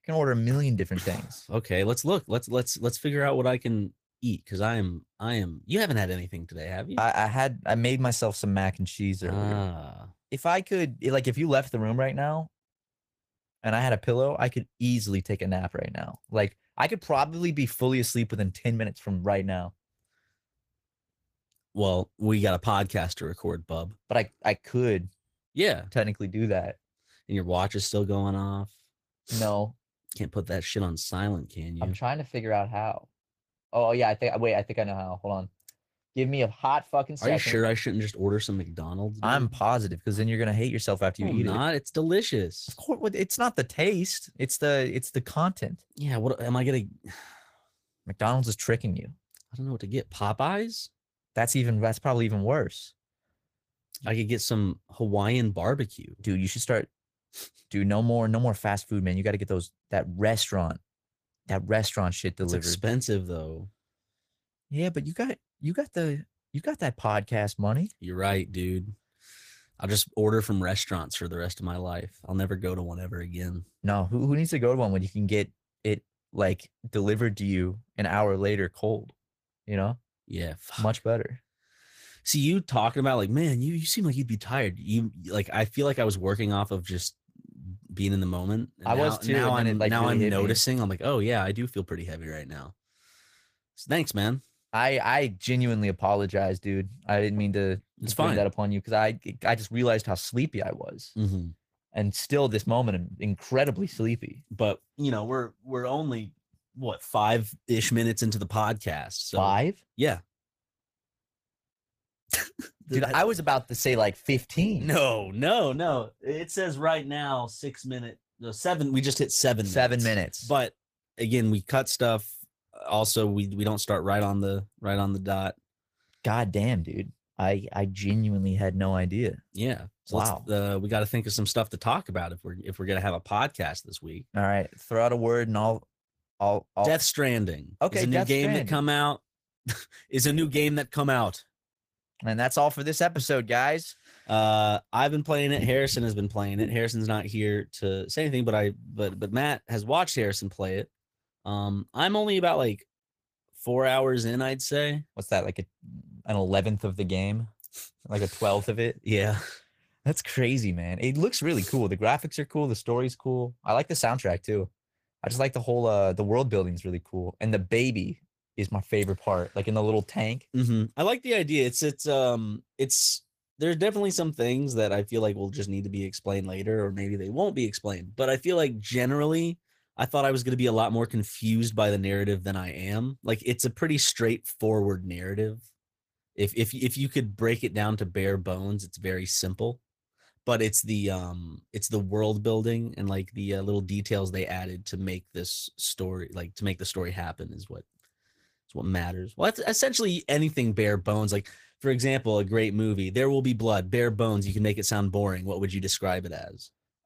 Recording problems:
garbled, watery; slightly; nothing above 15 kHz

